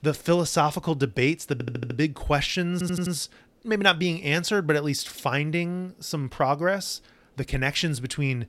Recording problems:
audio stuttering; at 1.5 s and at 2.5 s

